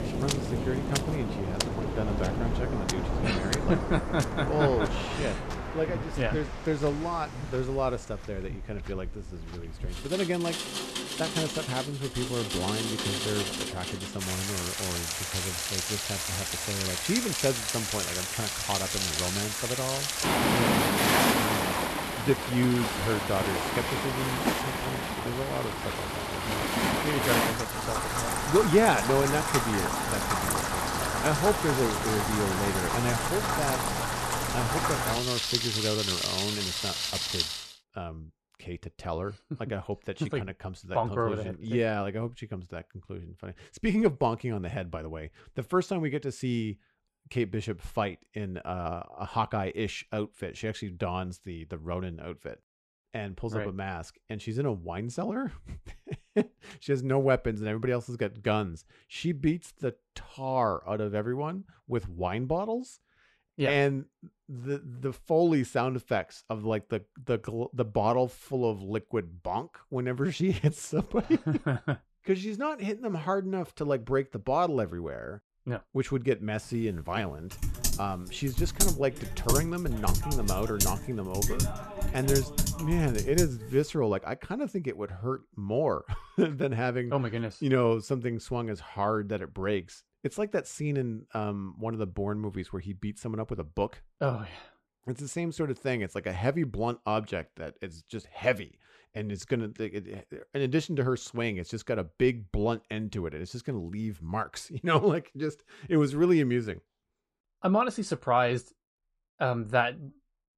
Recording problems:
rain or running water; very loud; until 38 s; 2 dB above the speech
keyboard typing; loud; from 1:18 to 1:23; peak 4 dB above the speech

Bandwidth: 13.5 kHz